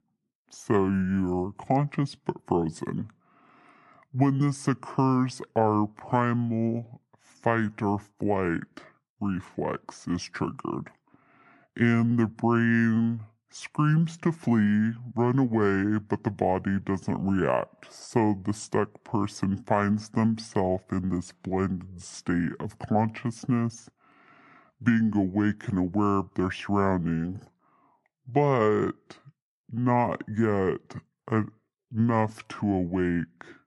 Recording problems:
wrong speed and pitch; too slow and too low; 0.6 times normal speed

